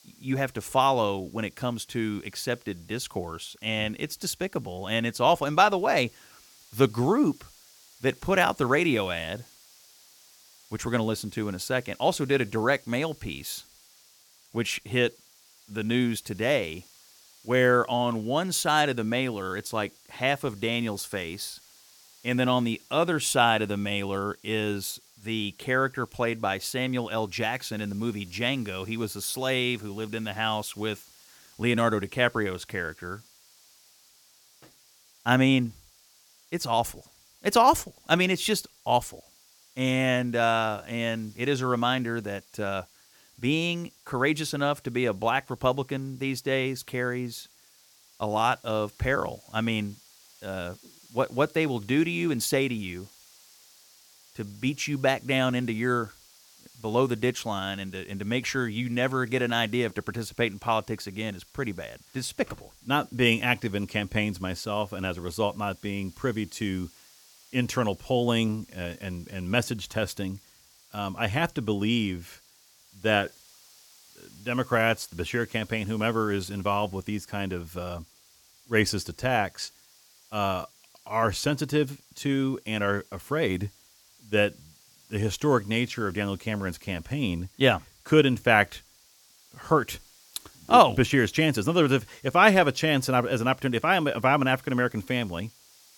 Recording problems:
hiss; faint; throughout; 25 dB below the speech

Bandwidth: 17.5 kHz